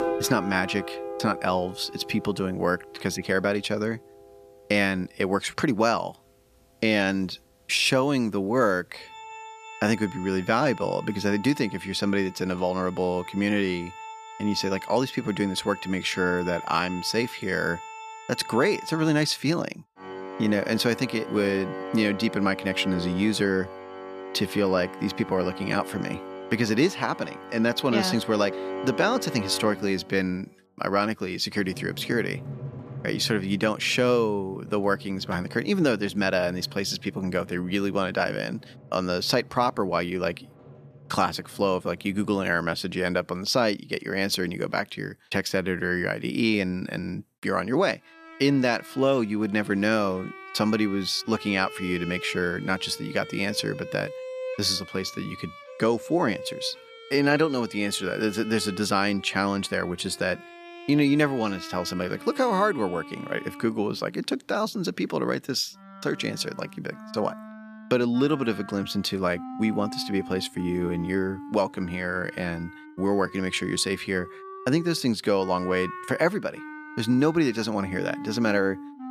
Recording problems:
background music; noticeable; throughout; 15 dB below the speech

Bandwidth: 14.5 kHz